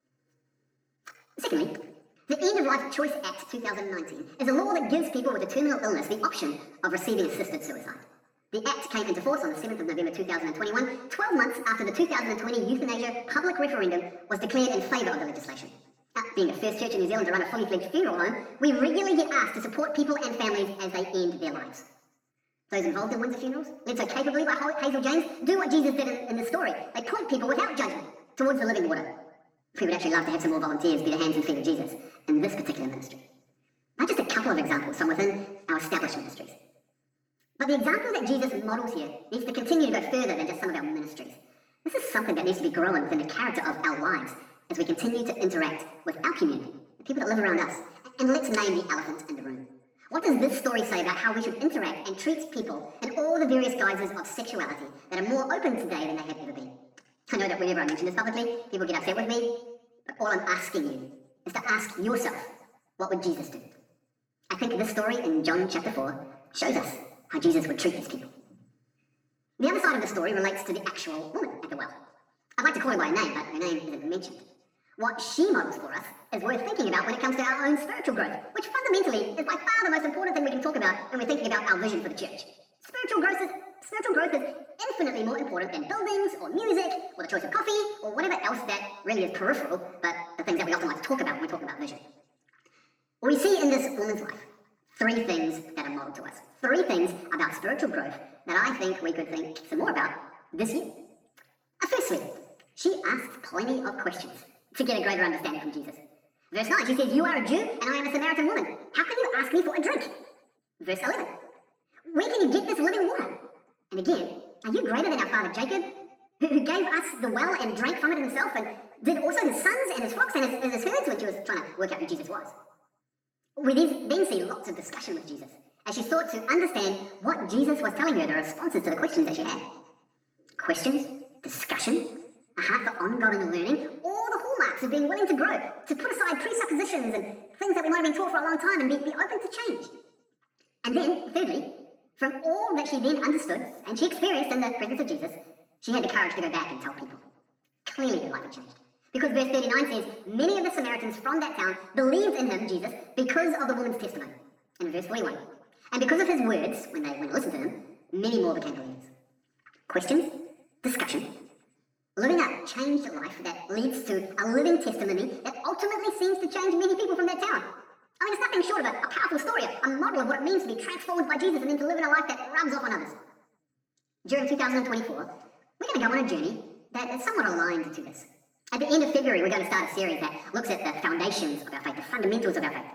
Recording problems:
off-mic speech; far
wrong speed and pitch; too fast and too high; 1.5 times normal speed
room echo; slight; dies away in 0.9 s

